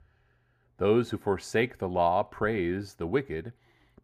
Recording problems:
muffled; slightly; fading above 2.5 kHz

